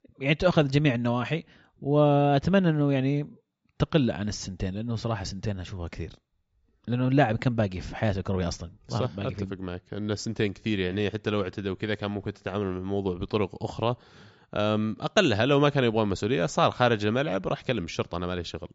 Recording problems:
high frequencies cut off; noticeable; nothing above 8 kHz

